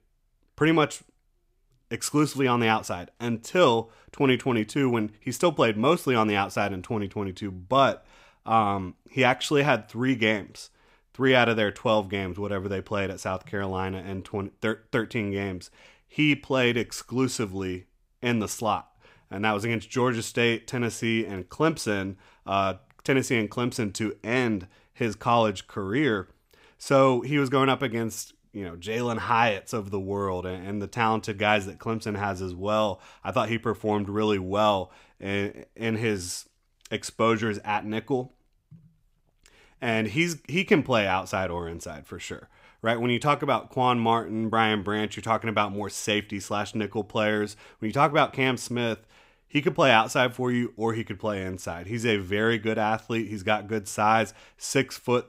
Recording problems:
none

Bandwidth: 15.5 kHz